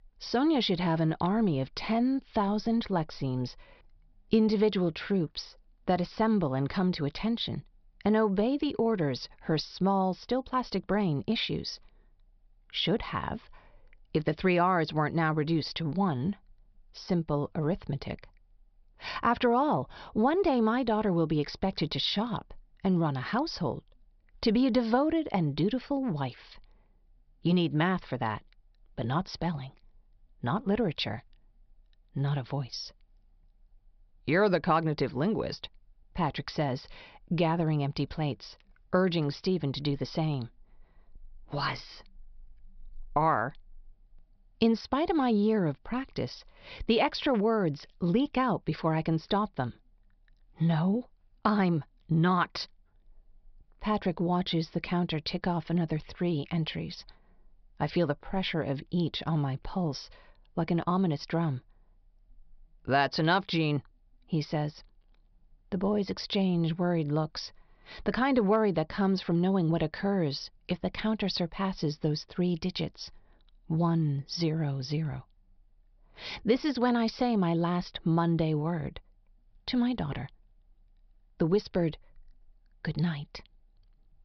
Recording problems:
high frequencies cut off; noticeable; nothing above 5.5 kHz

